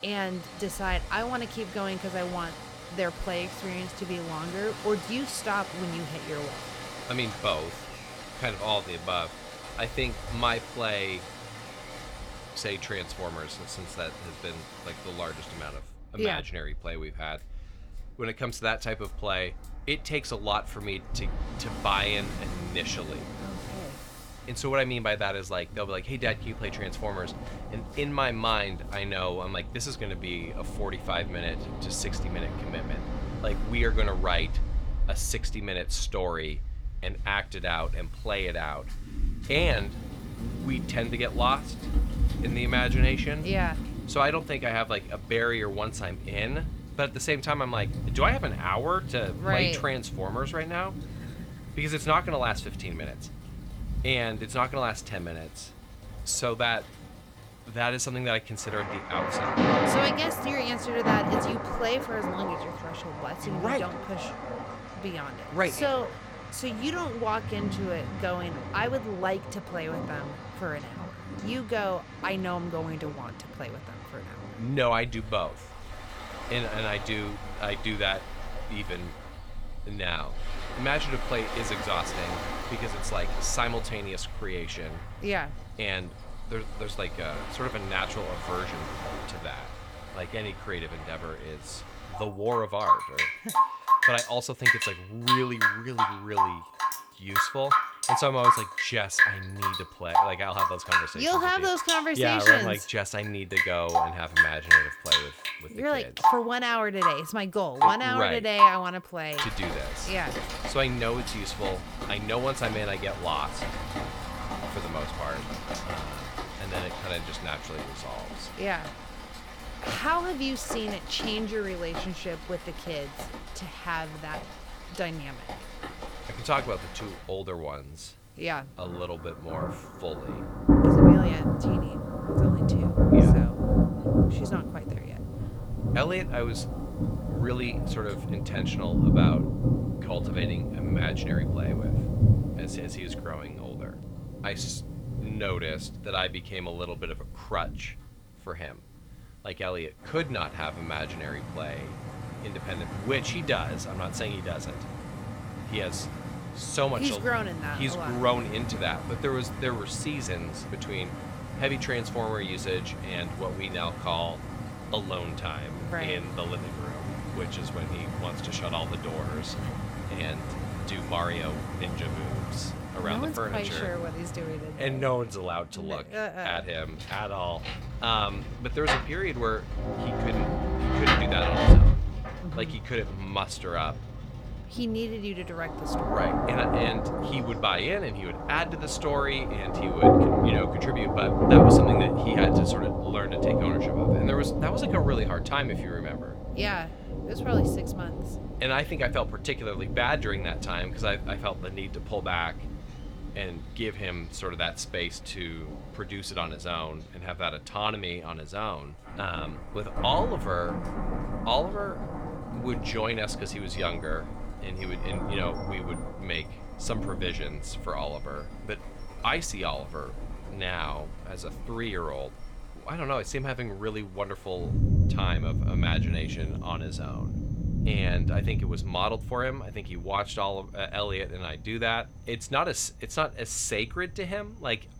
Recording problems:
rain or running water; very loud; throughout; 2 dB above the speech

